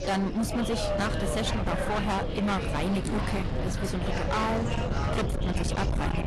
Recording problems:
distortion; heavy; 34% of the sound clipped
garbled, watery; slightly; nothing above 11.5 kHz
wind noise on the microphone; heavy; 8 dB below the speech
chatter from many people; loud; throughout; 5 dB below the speech
traffic noise; noticeable; throughout; 15 dB below the speech

